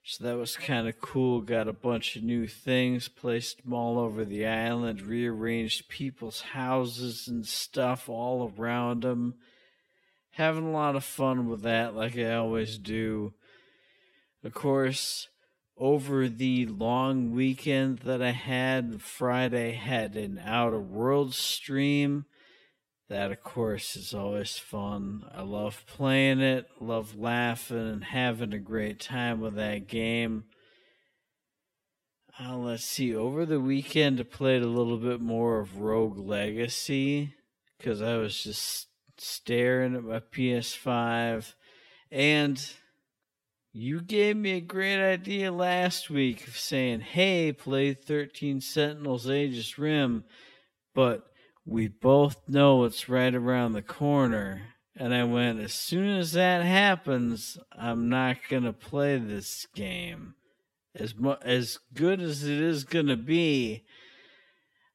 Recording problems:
wrong speed, natural pitch; too slow; 0.6 times normal speed

